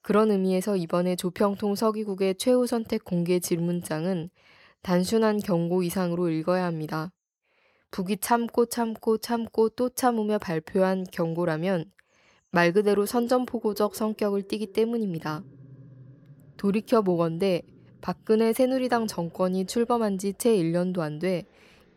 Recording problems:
animal sounds; faint; throughout; 25 dB below the speech

